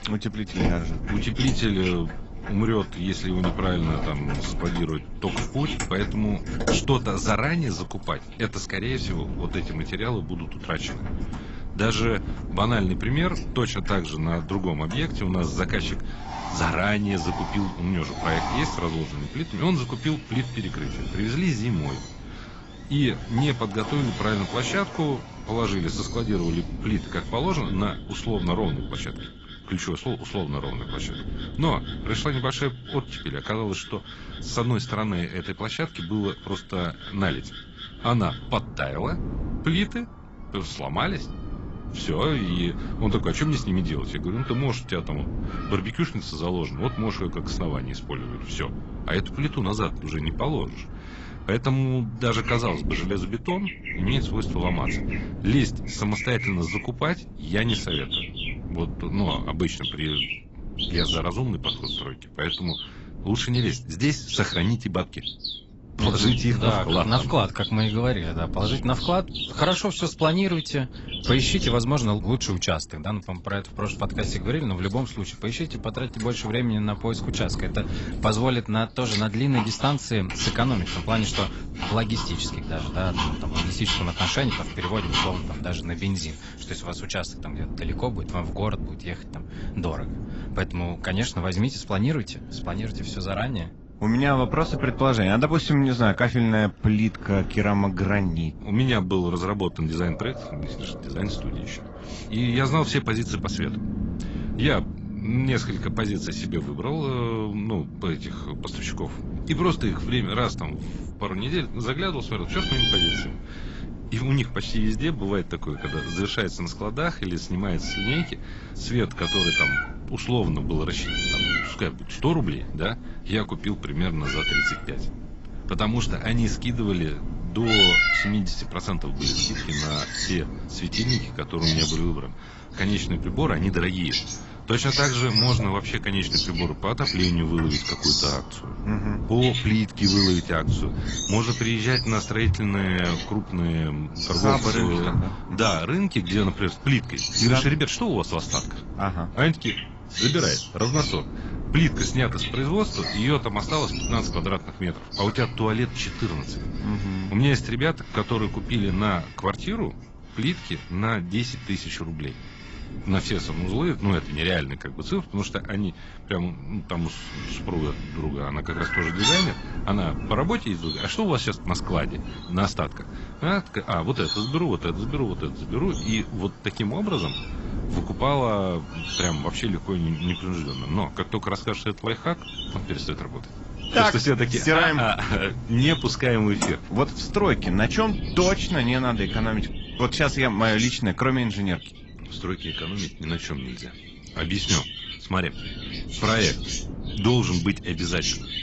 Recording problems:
garbled, watery; badly; nothing above 8 kHz
animal sounds; loud; throughout; 4 dB below the speech
wind noise on the microphone; occasional gusts; 15 dB below the speech

